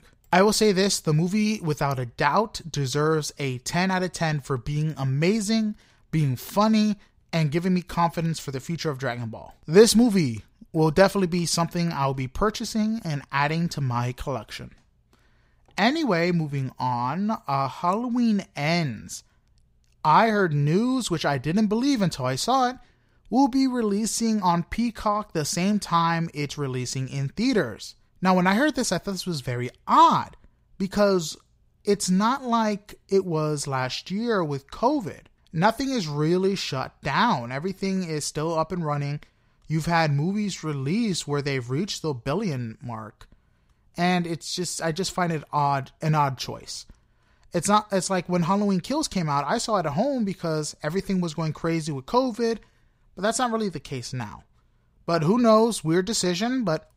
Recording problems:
none

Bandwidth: 15.5 kHz